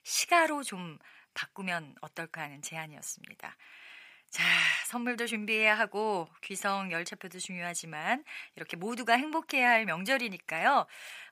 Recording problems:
thin; somewhat; fading below 1 kHz

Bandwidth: 15 kHz